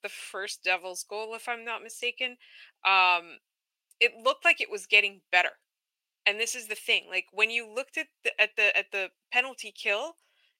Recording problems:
thin; very; fading below 700 Hz

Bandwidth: 16 kHz